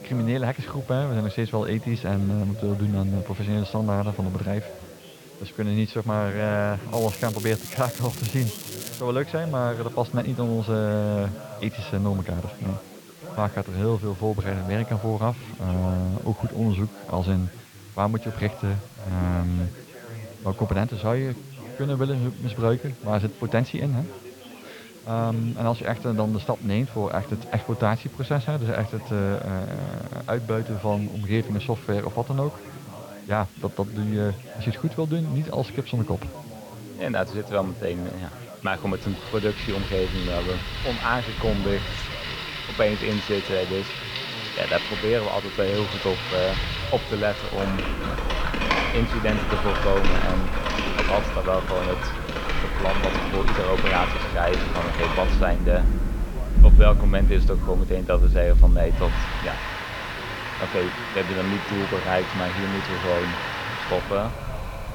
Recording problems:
muffled; very; fading above 3 kHz
rain or running water; very loud; from 39 s on; as loud as the speech
crackling; loud; from 7 to 9 s; 9 dB below the speech
chatter from many people; noticeable; throughout; 15 dB below the speech
hiss; faint; throughout; 20 dB below the speech

